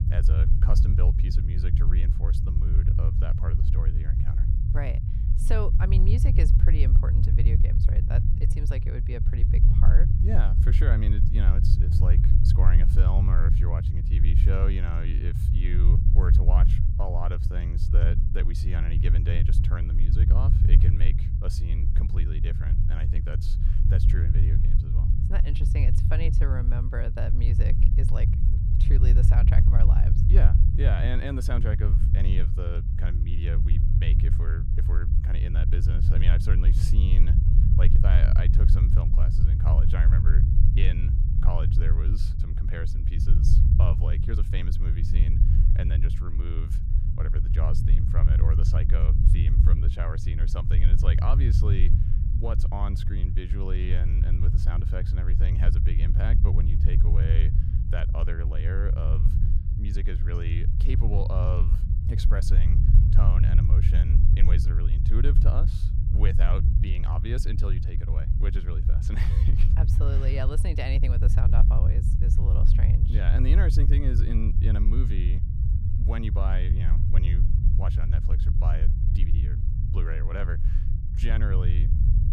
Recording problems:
low rumble; loud; throughout; 1 dB below the speech

